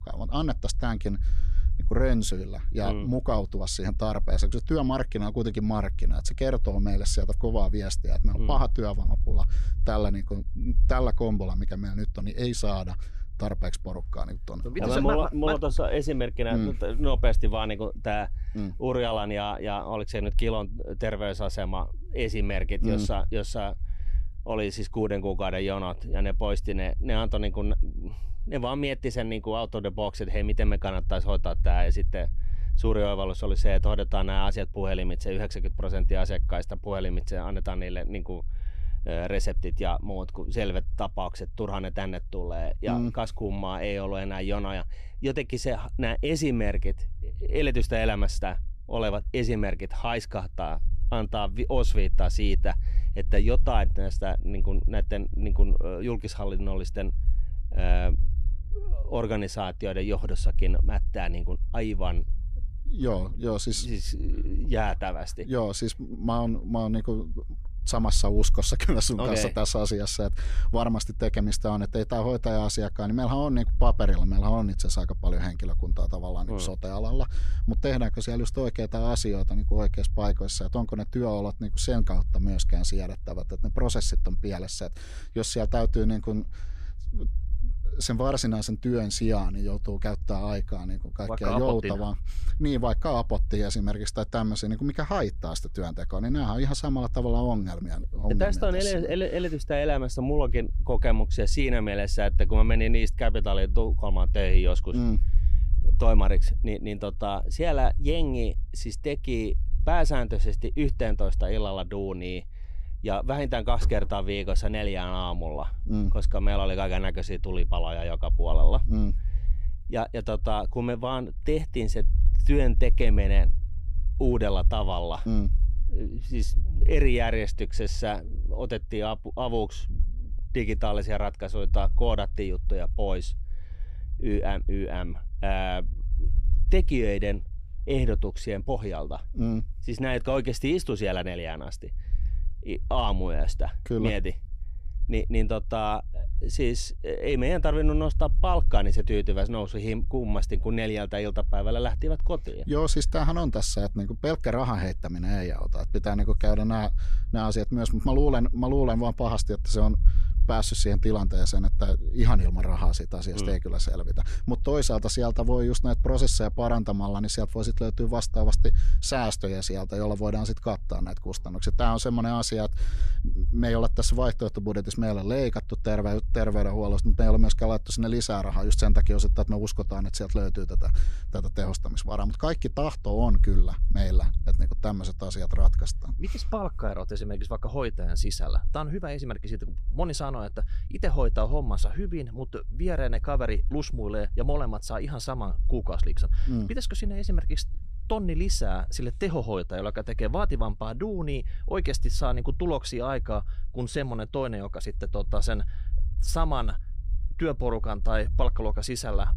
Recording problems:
low rumble; faint; throughout; 25 dB below the speech

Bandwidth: 15 kHz